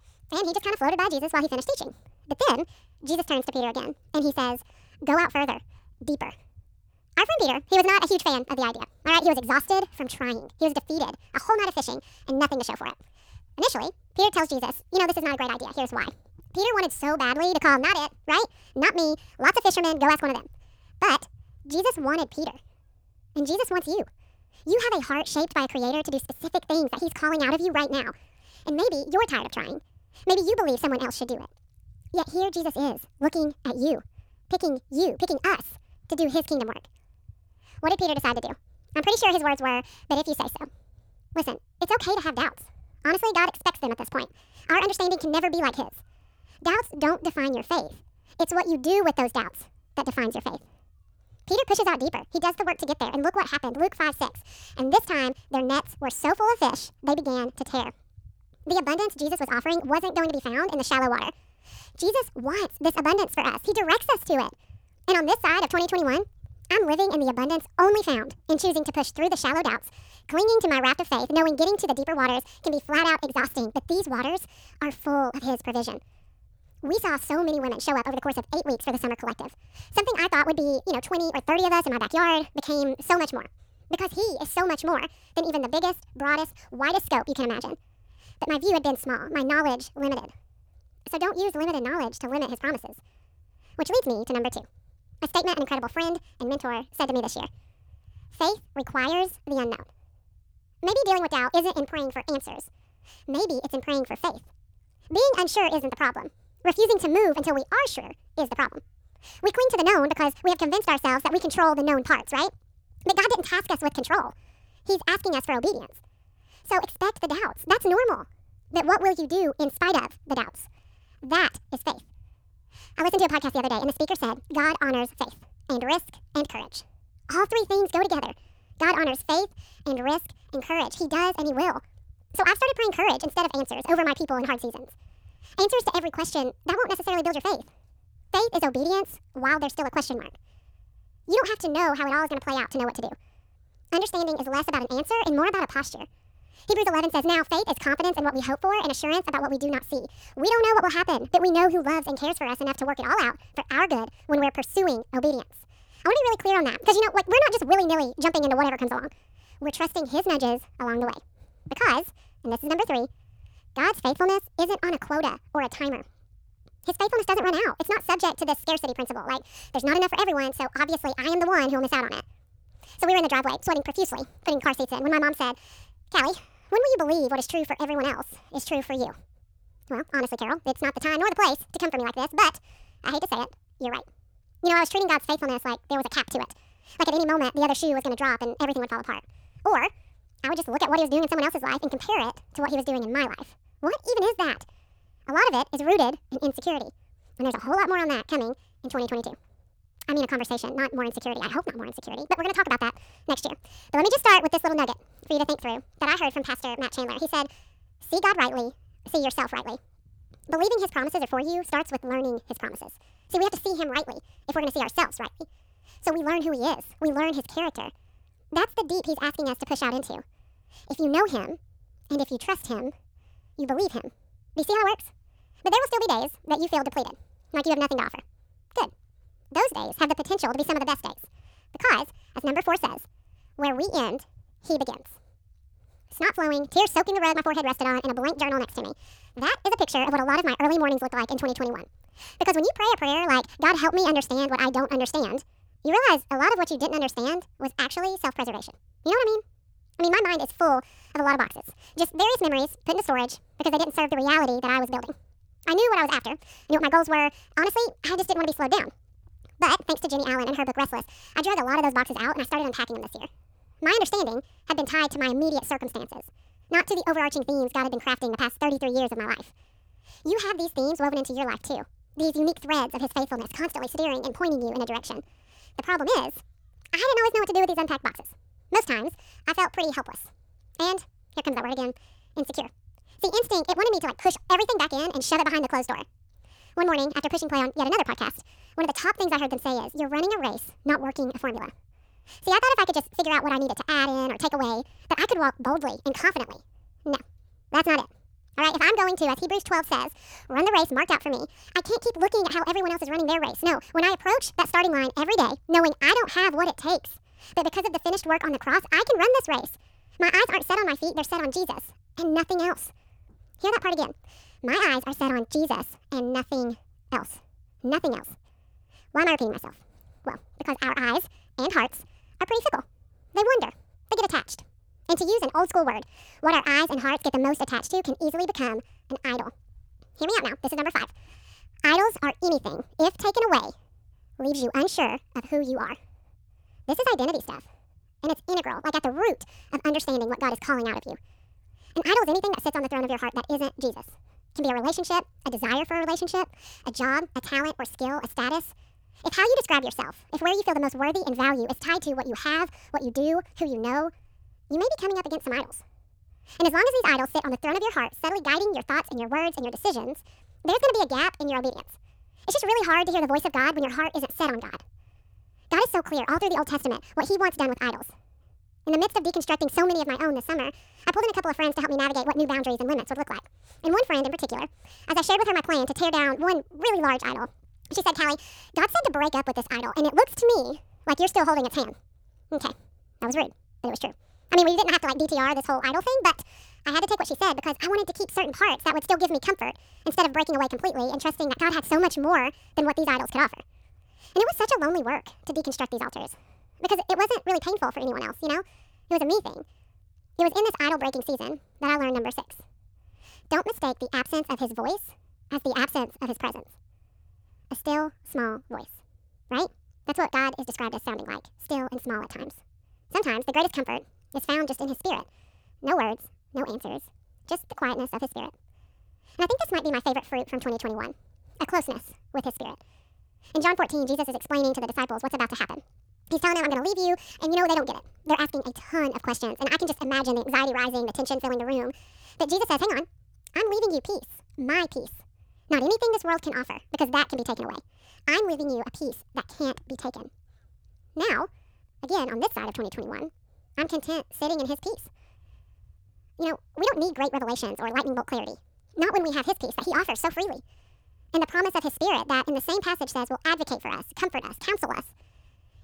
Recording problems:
wrong speed and pitch; too fast and too high; 1.6 times normal speed

